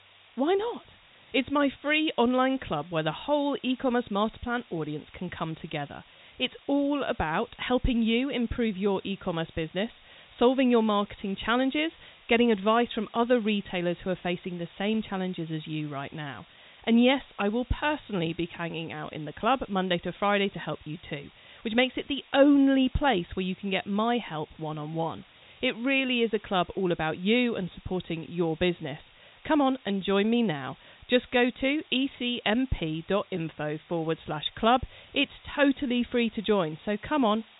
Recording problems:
high frequencies cut off; severe; nothing above 4 kHz
hiss; faint; throughout; 25 dB below the speech

